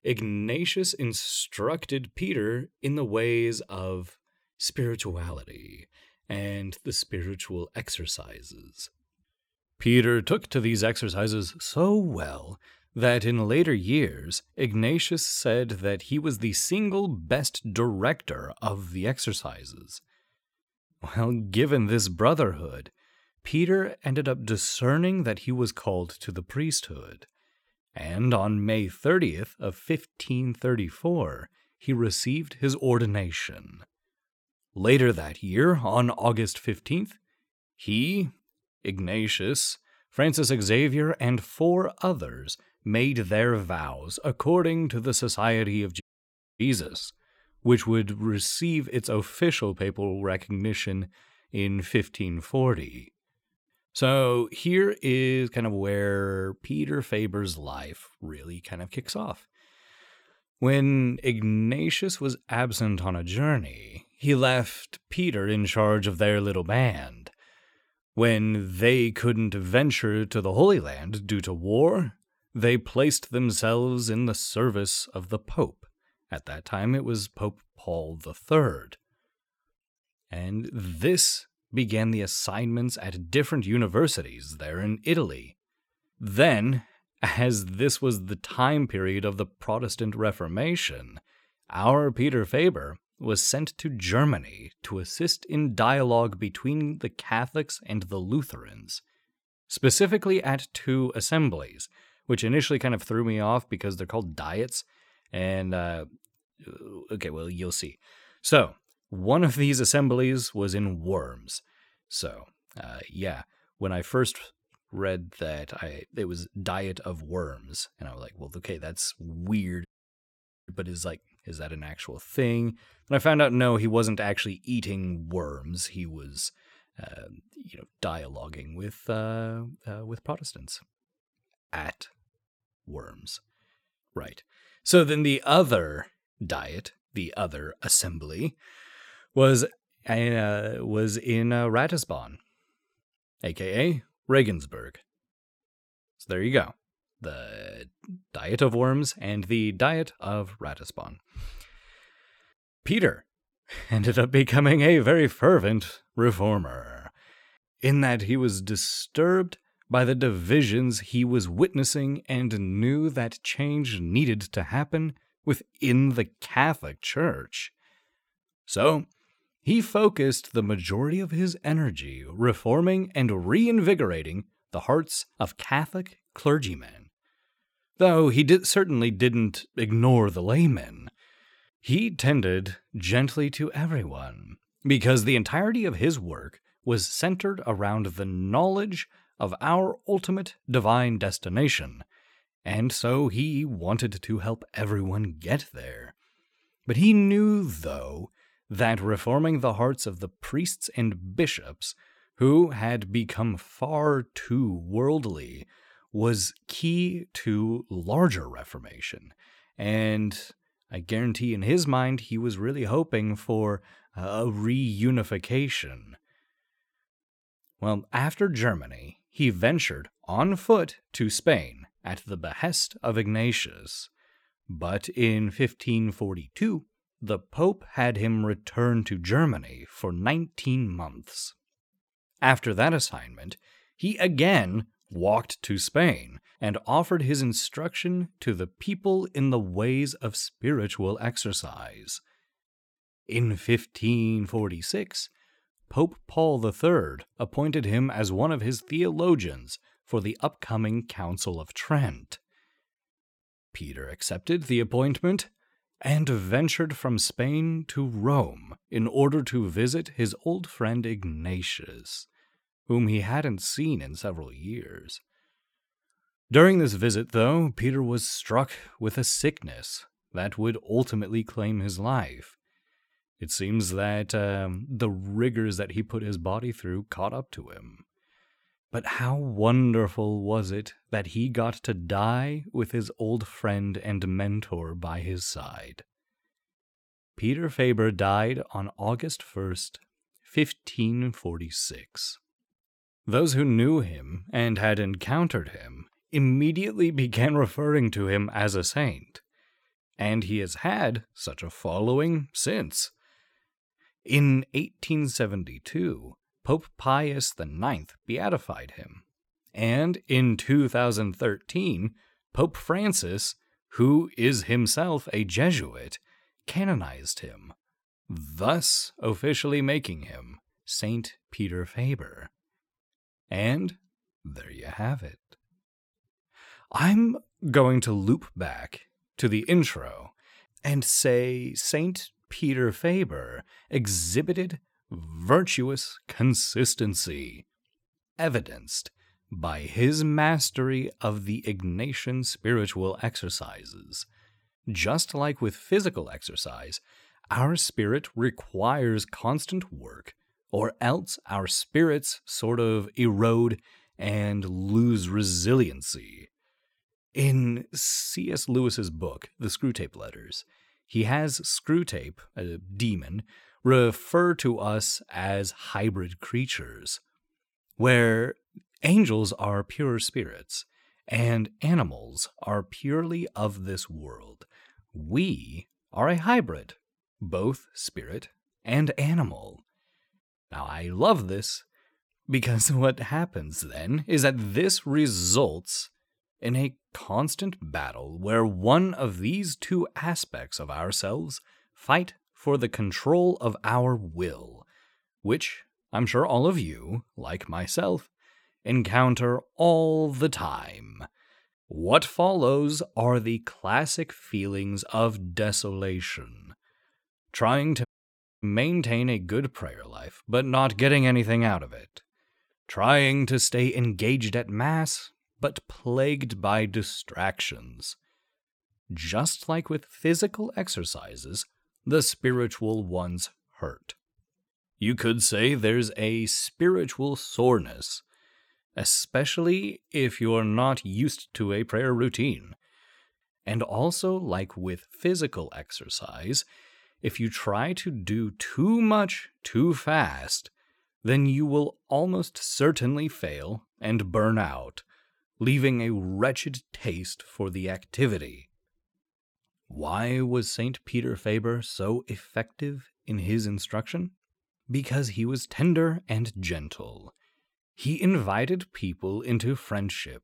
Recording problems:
audio cutting out; at 46 s for 0.5 s, at 2:00 for 1 s and at 6:48 for 0.5 s

